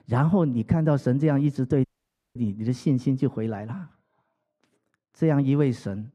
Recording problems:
muffled; very; fading above 2.5 kHz
audio cutting out; at 2 s for 0.5 s

